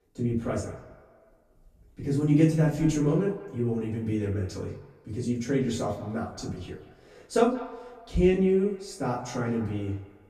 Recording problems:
off-mic speech; far
room echo; noticeable; dies away in 0.4 s
echo of what is said; faint; throughout; 180 ms later, 20 dB below the speech

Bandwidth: 14.5 kHz